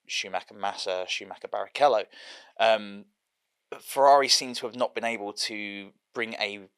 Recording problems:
thin; very; fading below 550 Hz

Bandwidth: 14.5 kHz